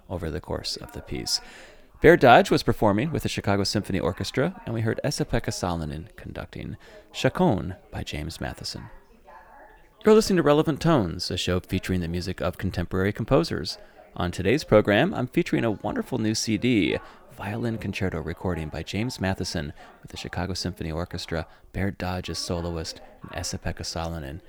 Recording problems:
background chatter; faint; throughout; 3 voices, 25 dB below the speech

